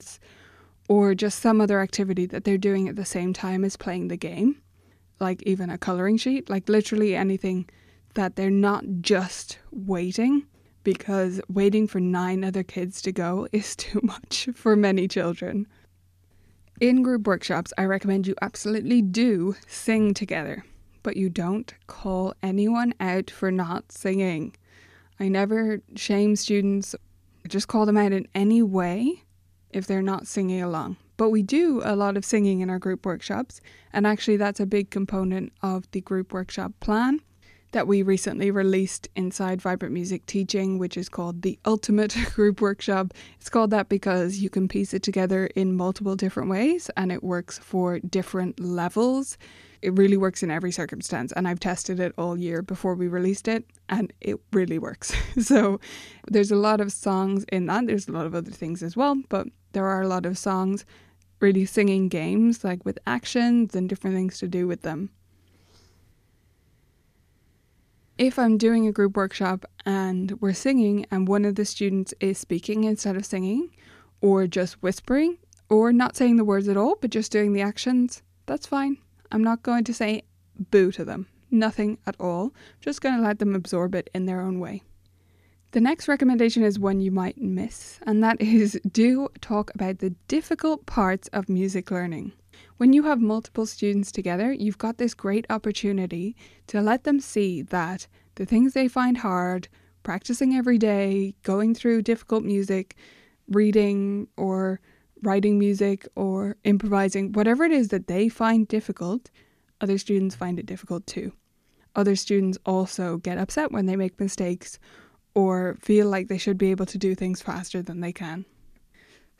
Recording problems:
none

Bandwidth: 14.5 kHz